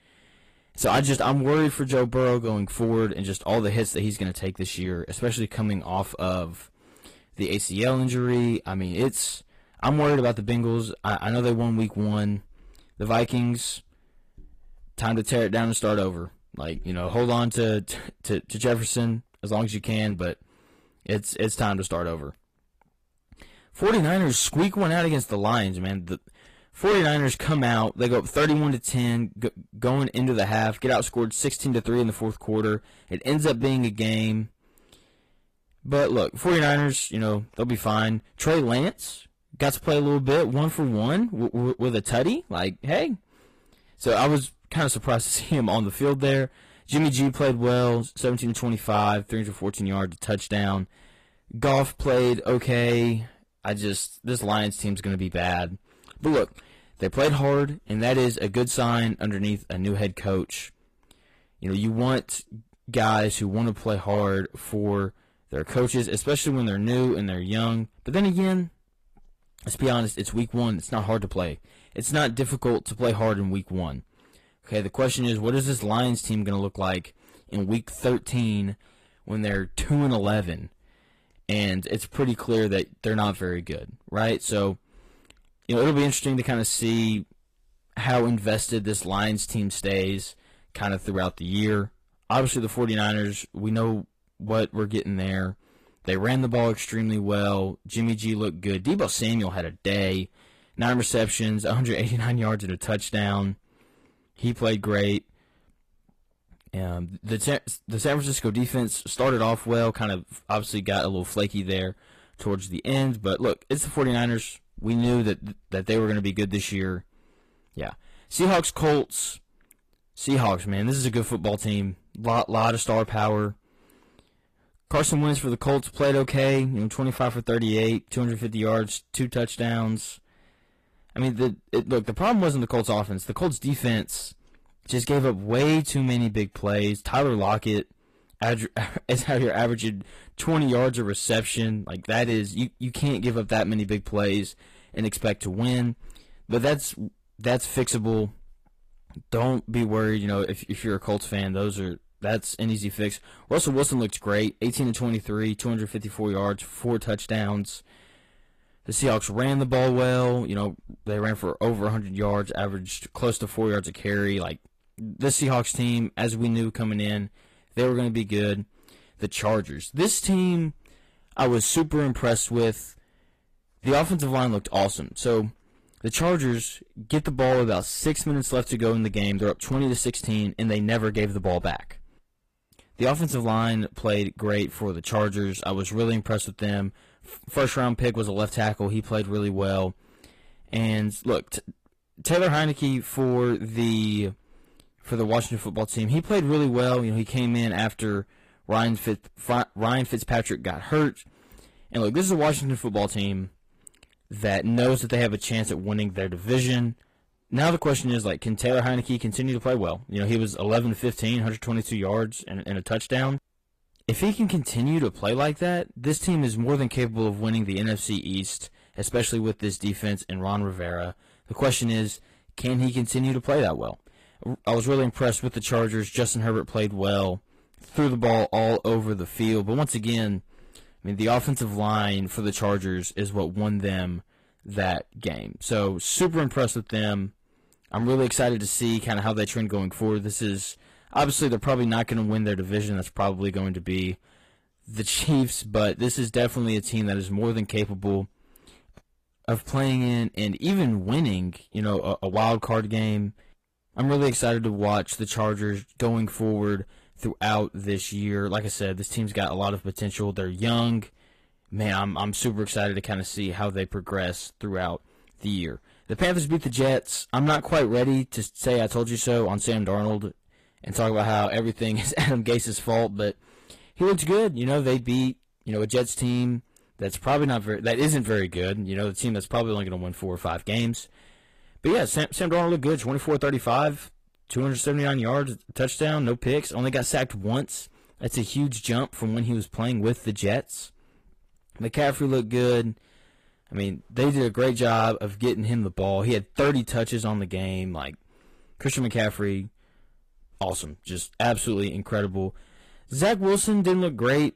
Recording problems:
distortion; slight; 5% of the sound clipped
garbled, watery; slightly; nothing above 14.5 kHz

